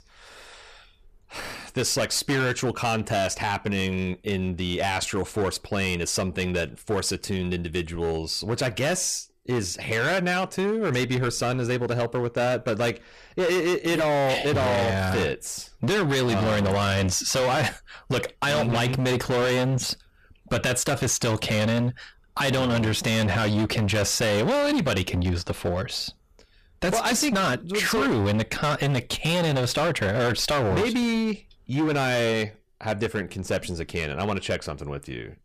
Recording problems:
distortion; heavy; 20% of the sound clipped

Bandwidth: 14.5 kHz